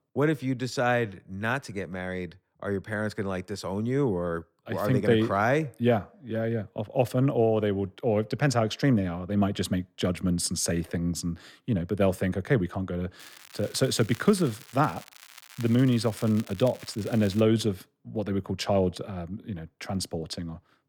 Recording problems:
crackling; noticeable; from 13 to 17 s; 20 dB below the speech

